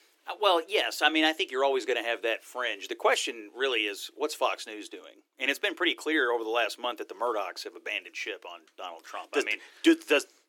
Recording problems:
thin; very; fading below 300 Hz

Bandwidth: 17.5 kHz